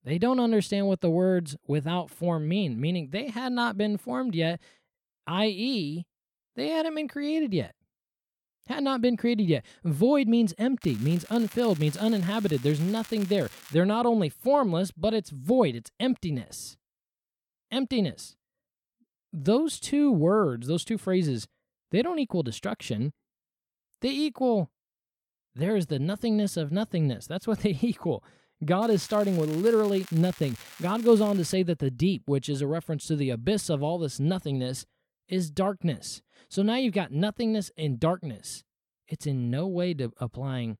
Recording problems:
crackling; noticeable; from 11 to 14 s and from 29 to 32 s; 20 dB below the speech

